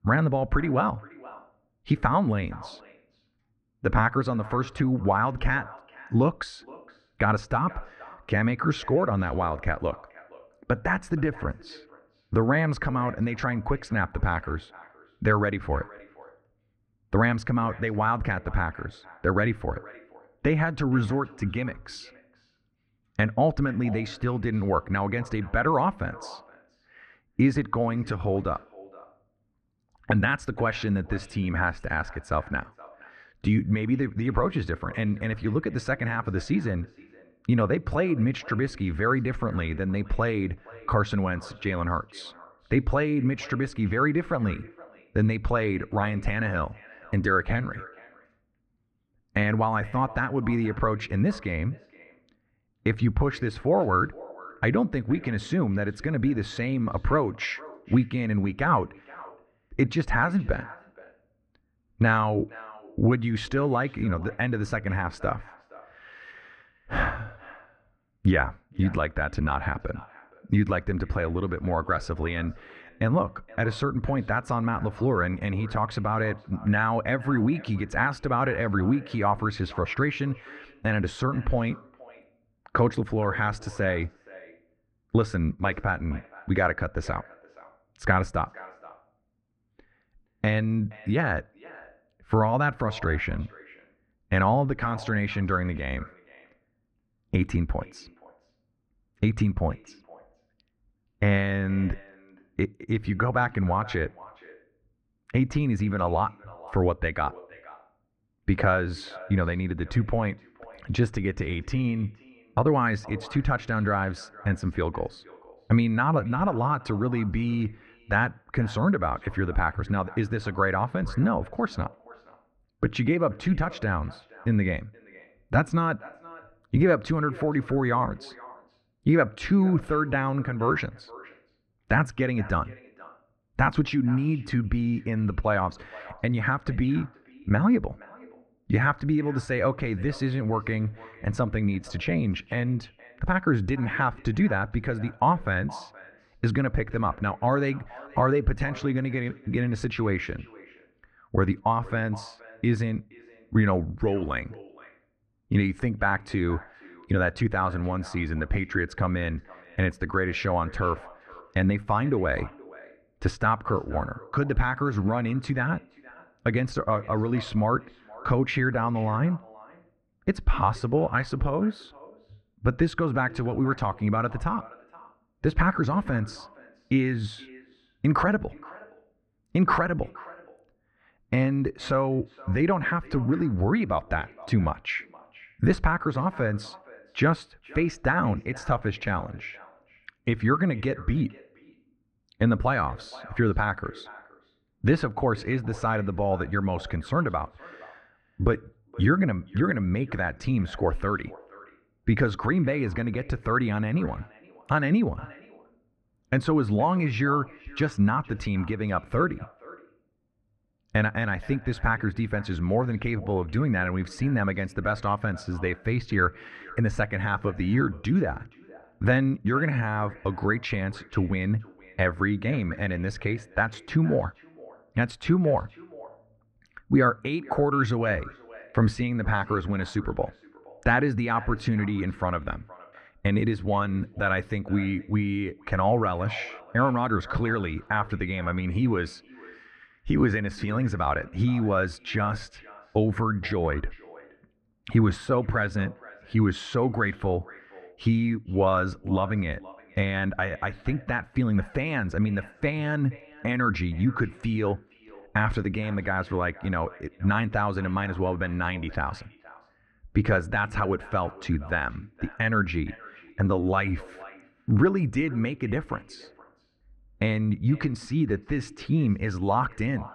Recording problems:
muffled; very; fading above 1.5 kHz
echo of what is said; faint; throughout; 470 ms later, 20 dB below the speech

